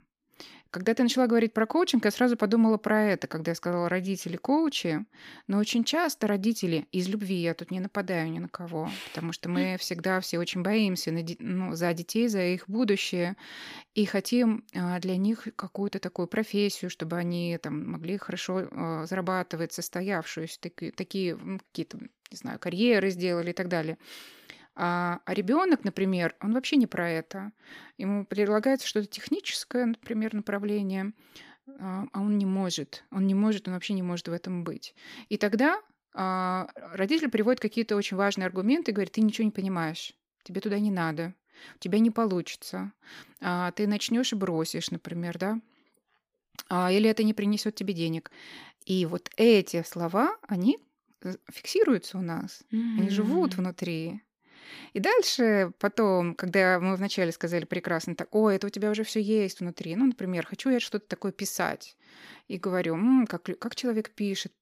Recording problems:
none

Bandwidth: 15 kHz